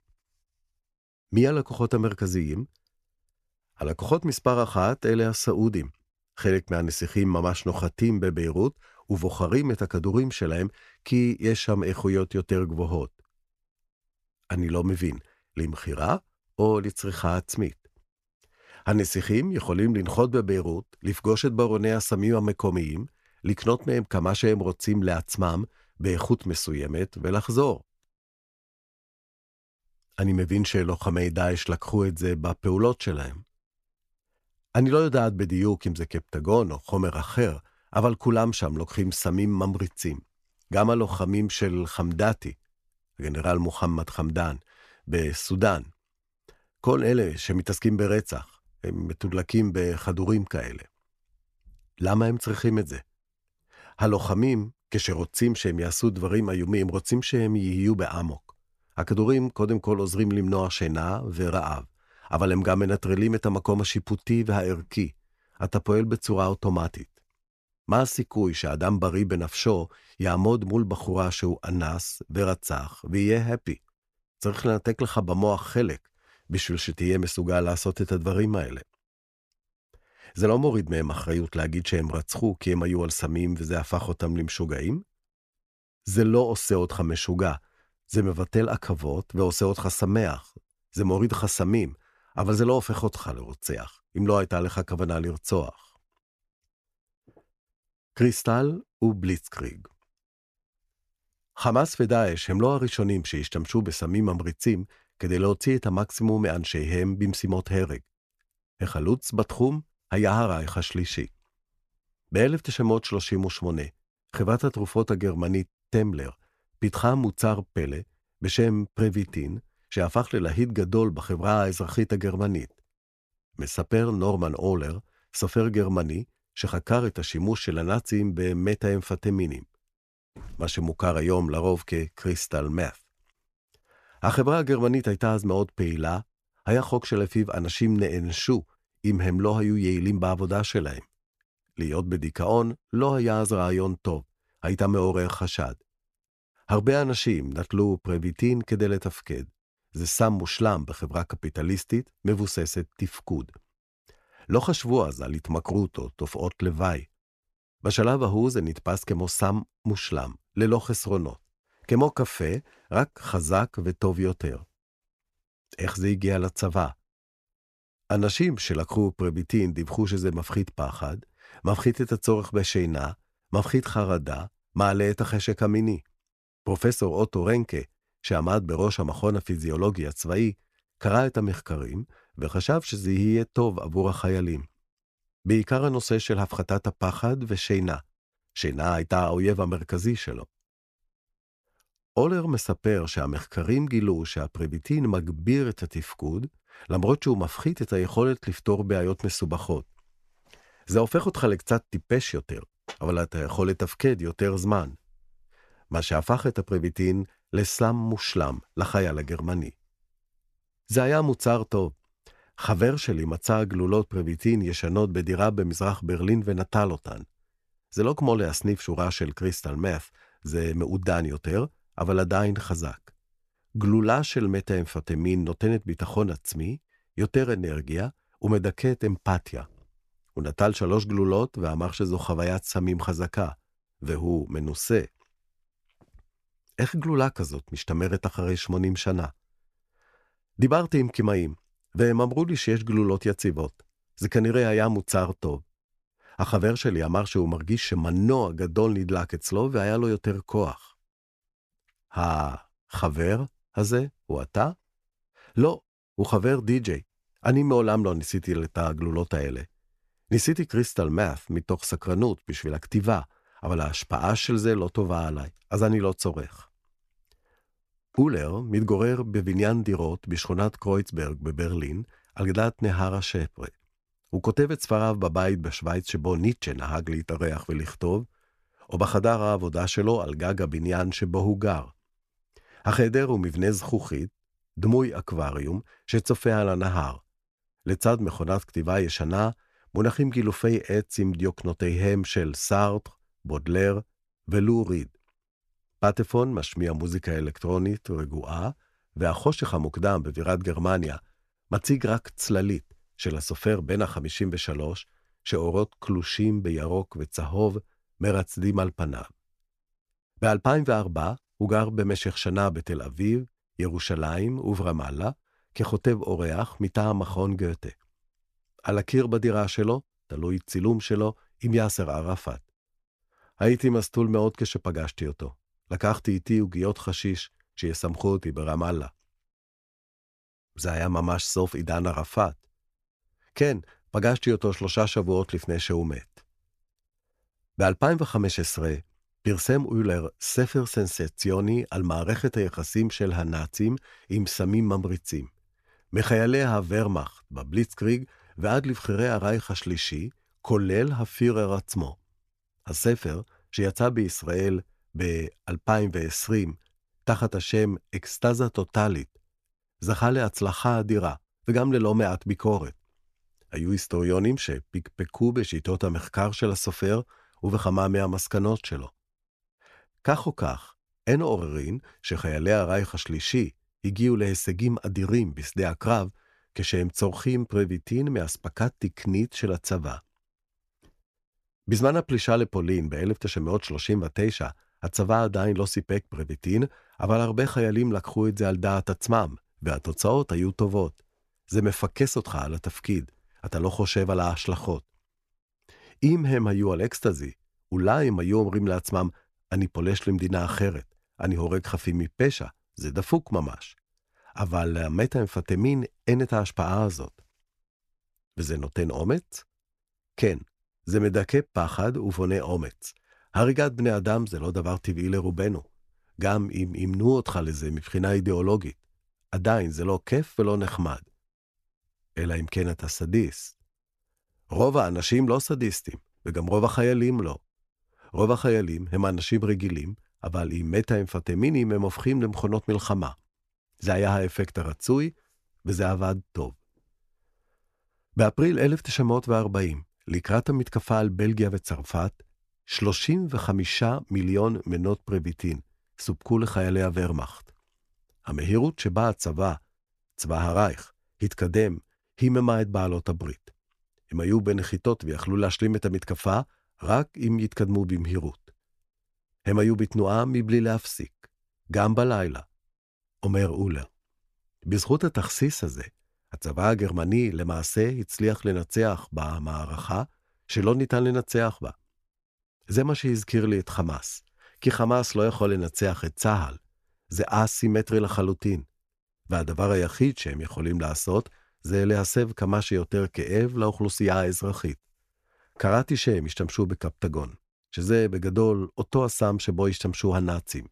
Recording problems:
none

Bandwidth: 14 kHz